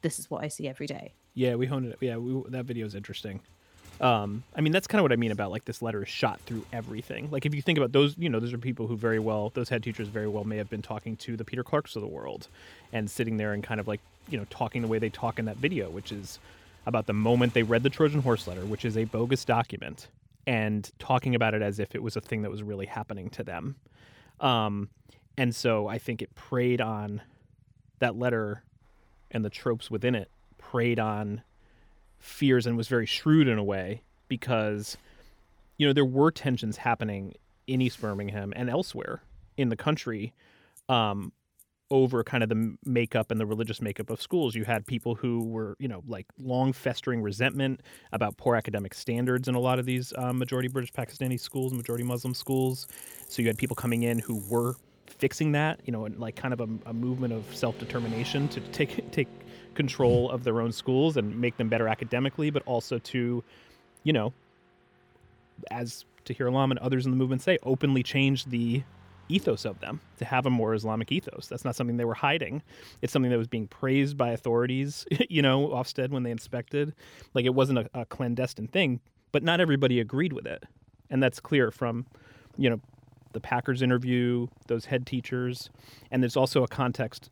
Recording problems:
traffic noise; faint; throughout; 20 dB below the speech

